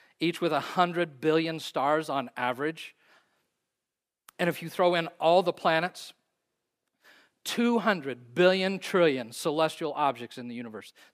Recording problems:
none

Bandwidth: 15 kHz